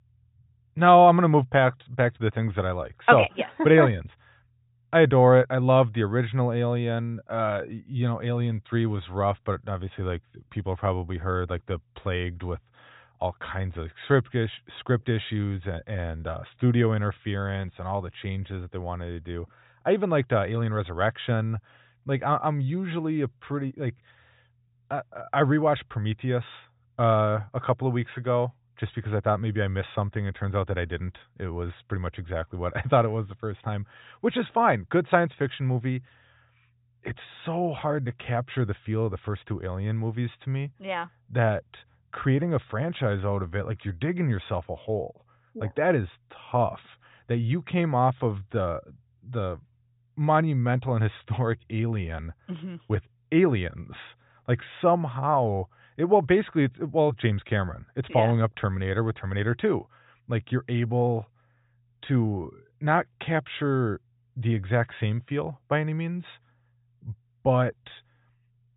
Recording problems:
high frequencies cut off; severe; nothing above 4 kHz

